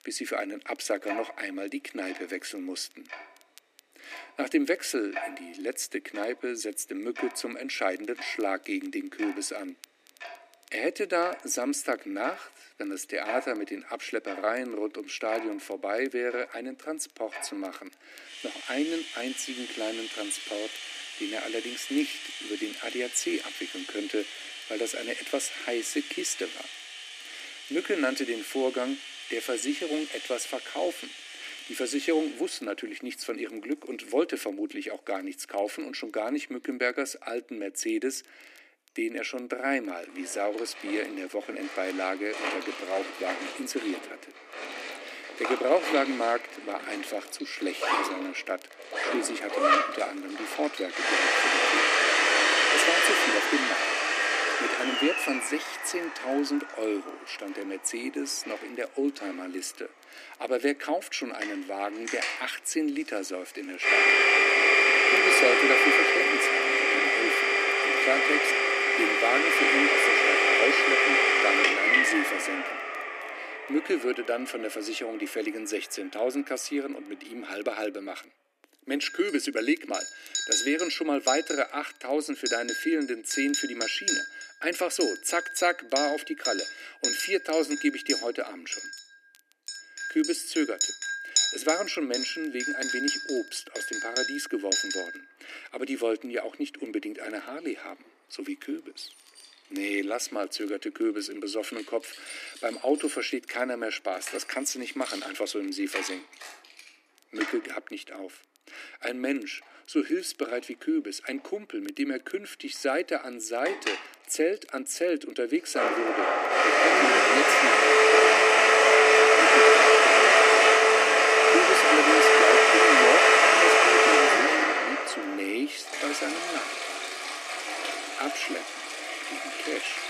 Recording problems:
thin; somewhat; fading below 300 Hz
household noises; very loud; throughout; 9 dB above the speech
crackle, like an old record; faint; 30 dB below the speech

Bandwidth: 14.5 kHz